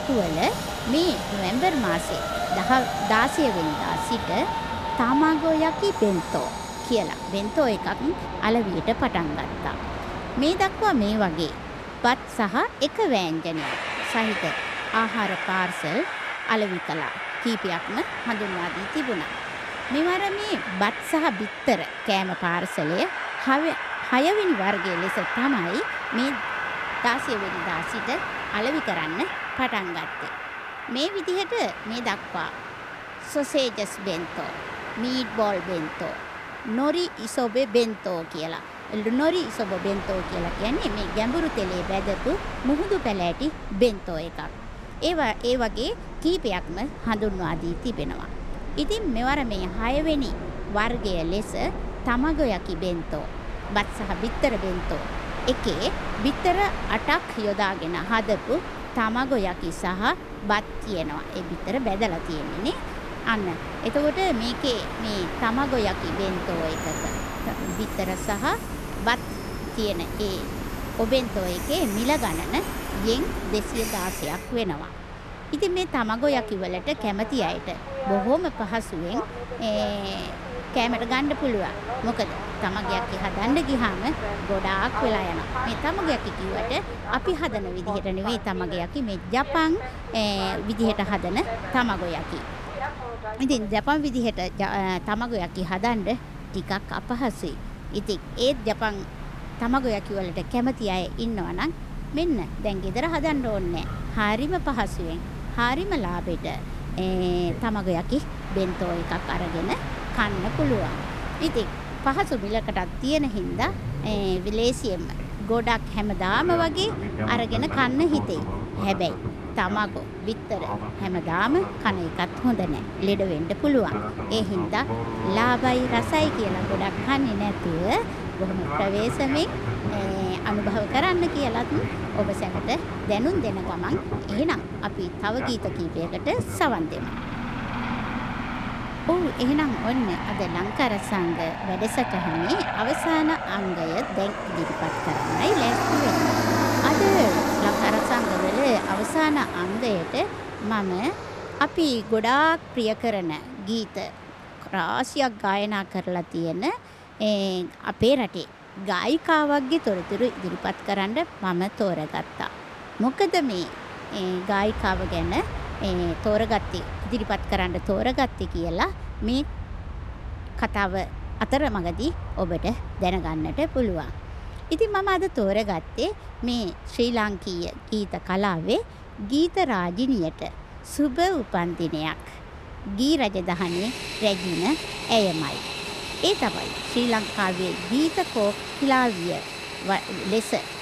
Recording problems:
train or aircraft noise; loud; throughout; 5 dB below the speech

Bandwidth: 14 kHz